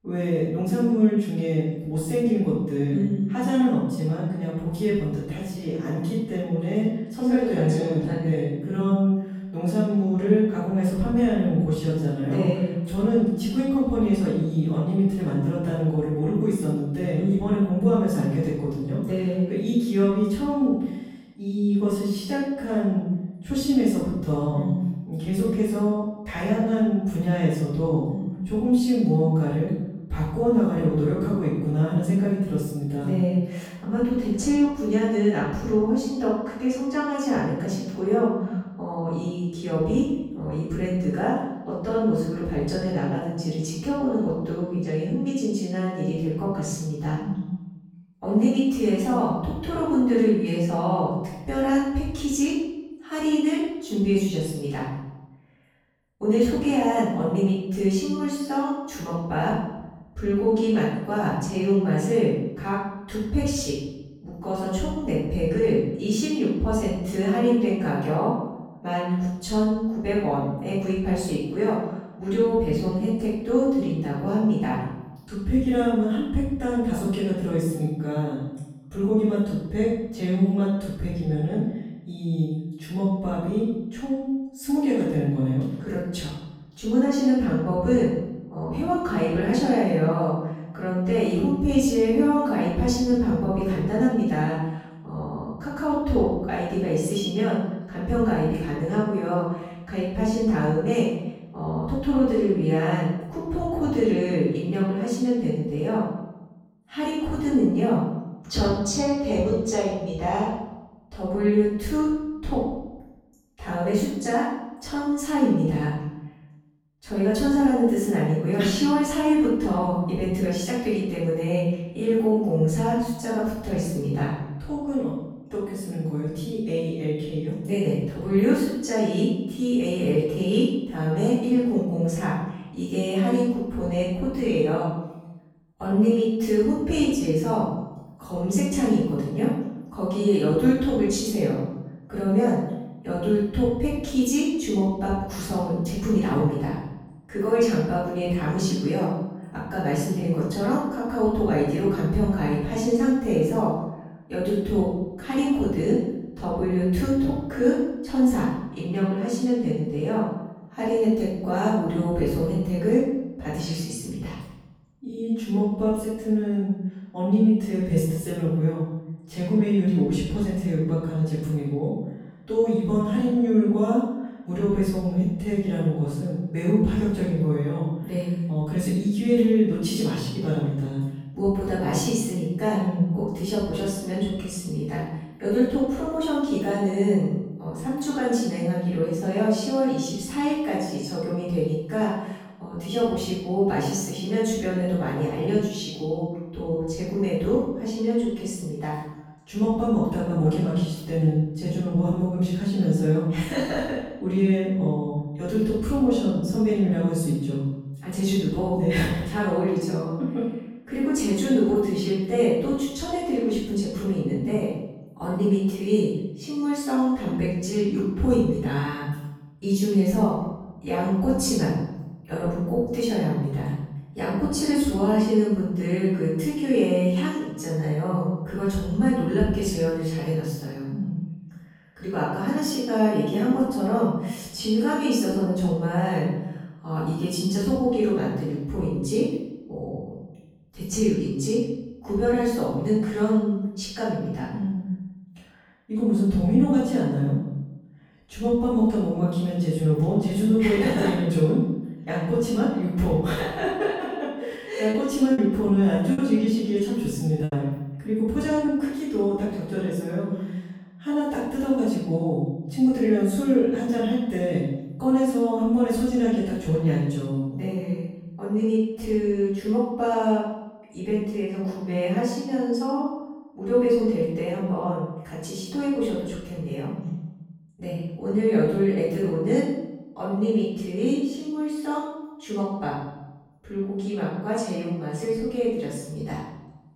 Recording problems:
room echo; strong; dies away in 0.9 s
off-mic speech; far
choppy; very; from 4:15 to 4:19; 6% of the speech affected

